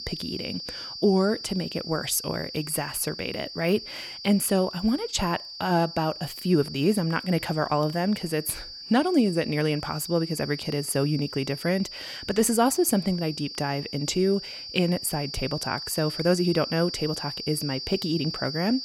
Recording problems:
high-pitched whine; loud; throughout; 4.5 kHz, 9 dB below the speech

